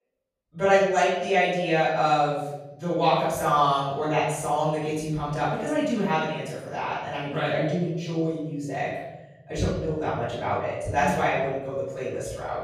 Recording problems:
room echo; strong; dies away in 1.1 s
off-mic speech; far

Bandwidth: 14.5 kHz